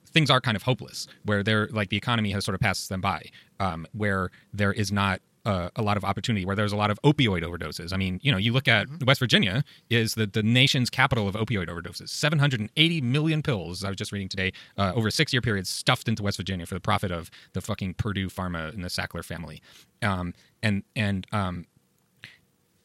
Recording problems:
wrong speed, natural pitch; too fast; 1.6 times normal speed

